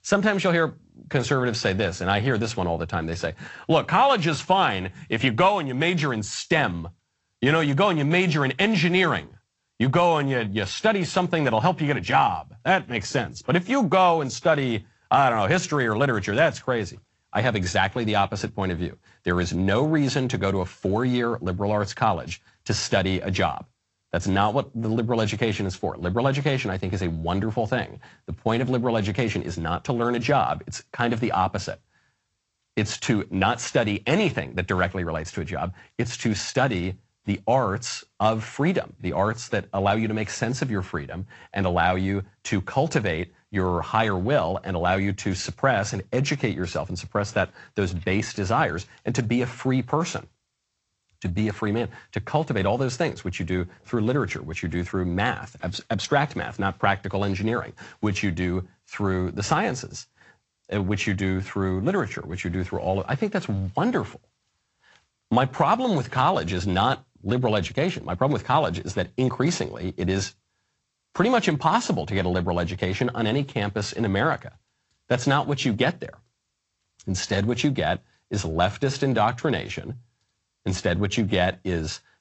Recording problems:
garbled, watery; slightly; nothing above 8 kHz
high frequencies cut off; slight

